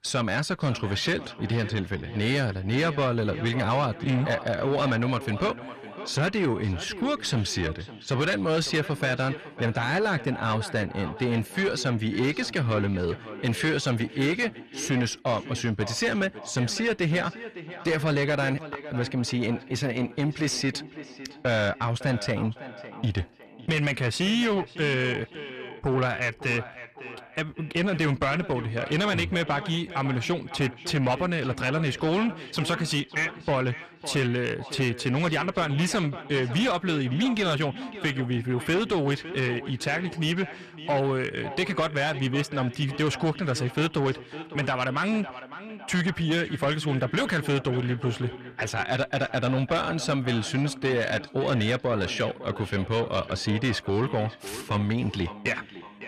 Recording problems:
echo of what is said; noticeable; throughout; 560 ms later, 15 dB below the speech
distortion; slight; 10 dB below the speech

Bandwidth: 14 kHz